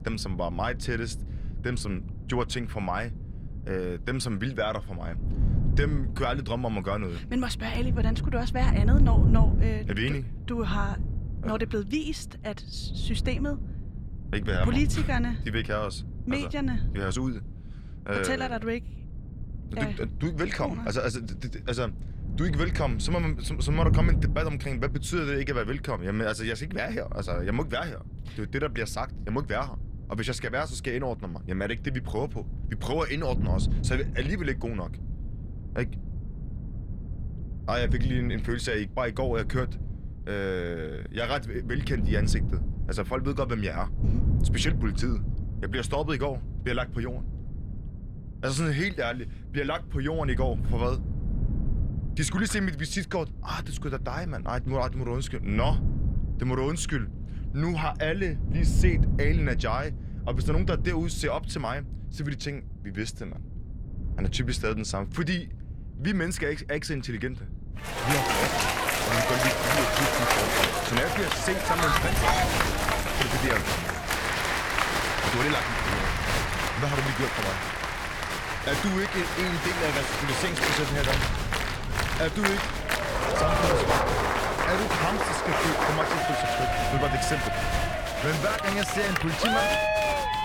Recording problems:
crowd noise; very loud; from 1:08 on; 5 dB above the speech
wind noise on the microphone; occasional gusts; 15 dB below the speech

